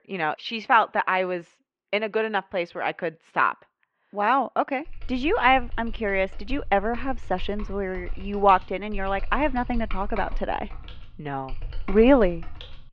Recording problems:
muffled; very; fading above 2.5 kHz
keyboard typing; faint; from 5 s on; peak 10 dB below the speech

